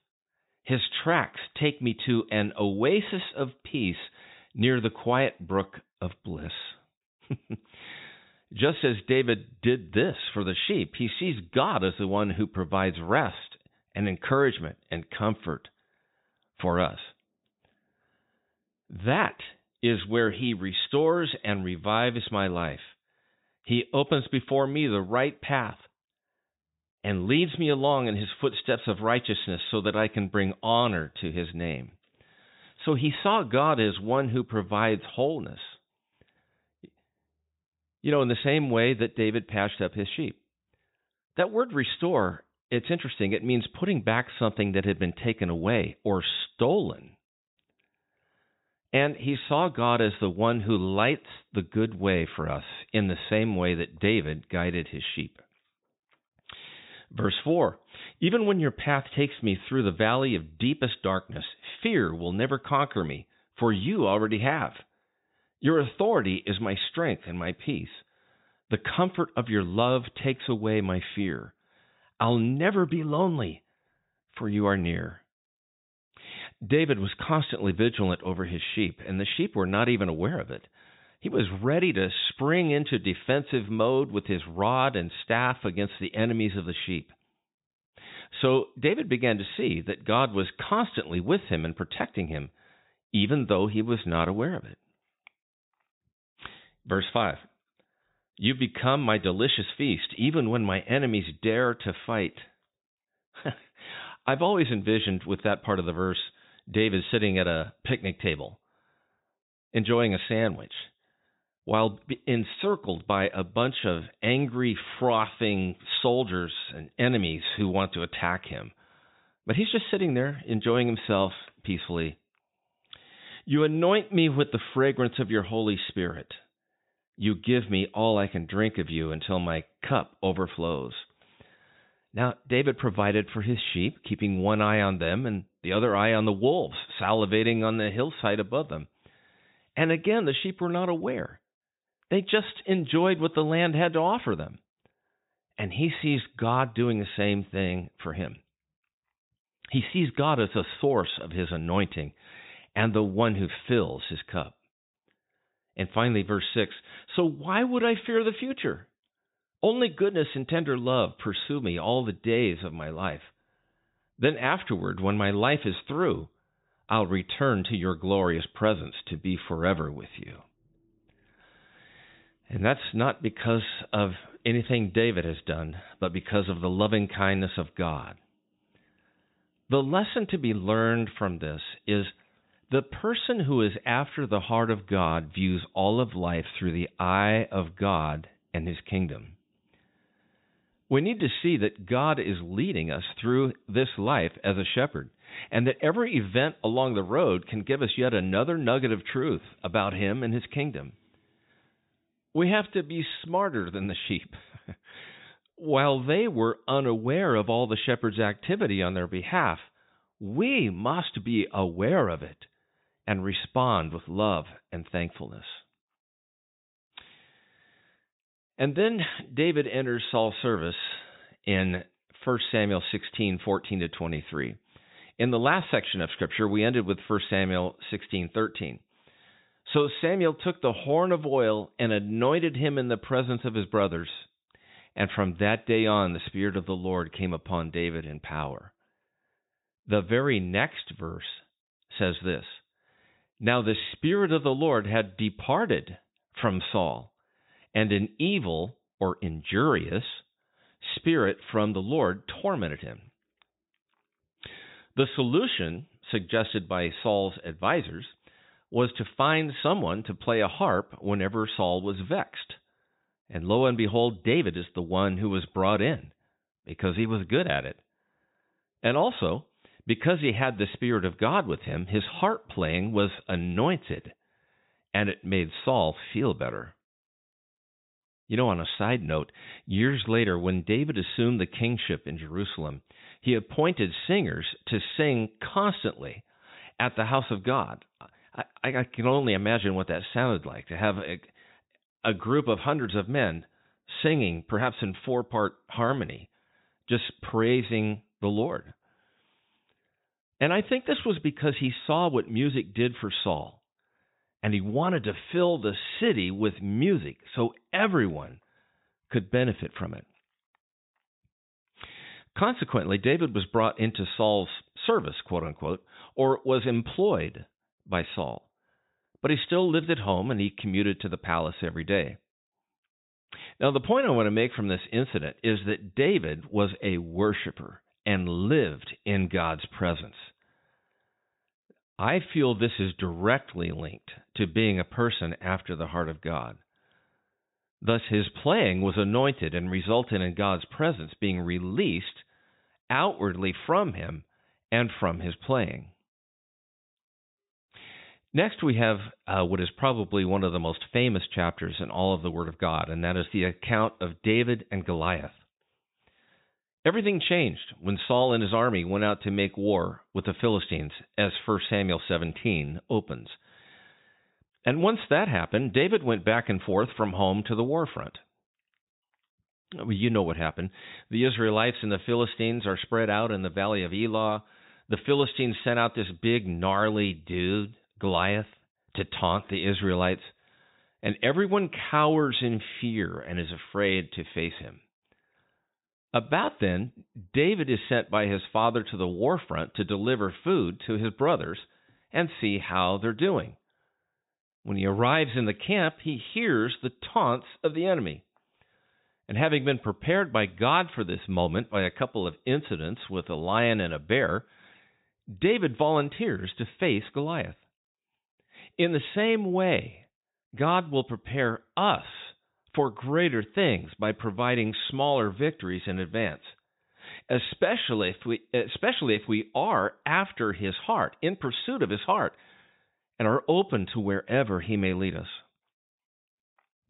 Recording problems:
high frequencies cut off; severe; nothing above 4 kHz

